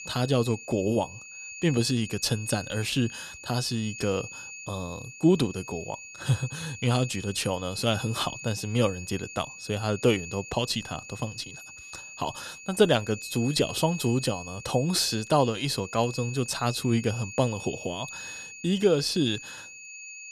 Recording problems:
high-pitched whine; noticeable; throughout; 2.5 kHz, 10 dB below the speech

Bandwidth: 14.5 kHz